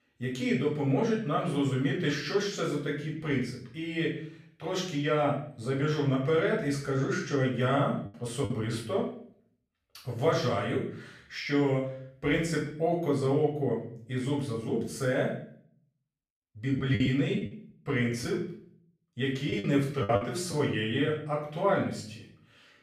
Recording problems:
off-mic speech; far
room echo; noticeable; dies away in 0.5 s
choppy; very; at 8.5 s and from 17 to 21 s; 9% of the speech affected

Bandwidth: 14.5 kHz